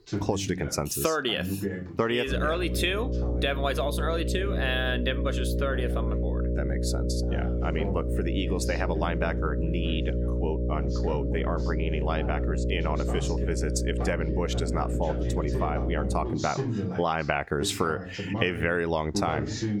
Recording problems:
squashed, flat; somewhat
electrical hum; loud; from 2.5 to 16 s; 60 Hz, 7 dB below the speech
voice in the background; loud; throughout; 7 dB below the speech

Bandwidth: 18 kHz